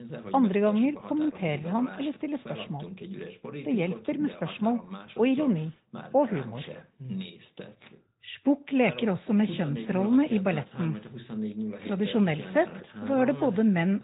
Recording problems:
high frequencies cut off; severe; nothing above 4 kHz
garbled, watery; slightly
voice in the background; noticeable; throughout; 15 dB below the speech

